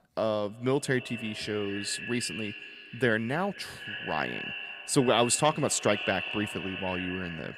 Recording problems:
echo of what is said; strong; throughout; 250 ms later, 8 dB below the speech

